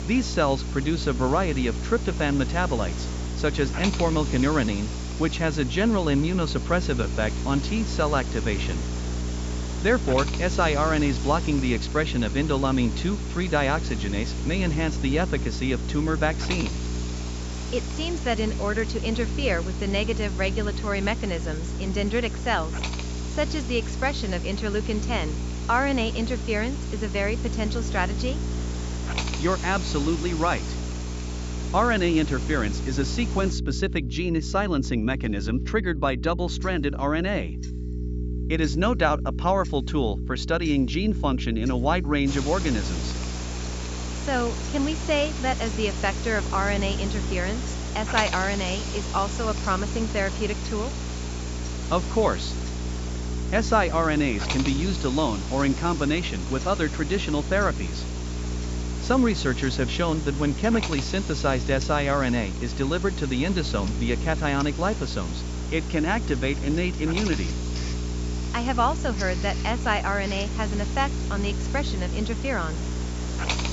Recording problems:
high frequencies cut off; noticeable; nothing above 8 kHz
electrical hum; noticeable; throughout; 60 Hz, 15 dB below the speech
hiss; noticeable; until 34 s and from 42 s on; 10 dB below the speech
household noises; faint; throughout; 25 dB below the speech

